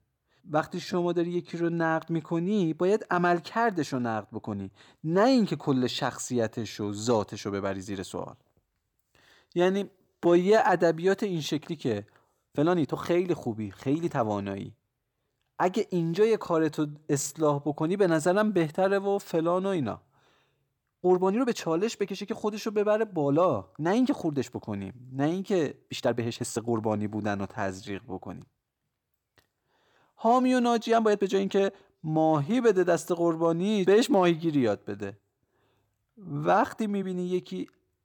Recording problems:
uneven, jittery; strongly; from 0.5 to 37 s

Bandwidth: 18.5 kHz